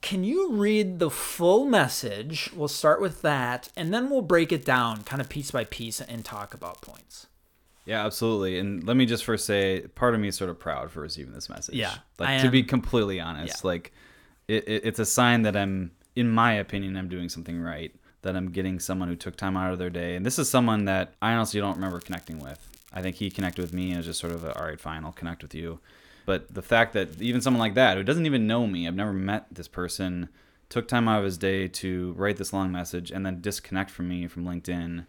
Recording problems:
crackling; faint; 4 times, first at 3.5 s; 25 dB below the speech

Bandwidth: 18 kHz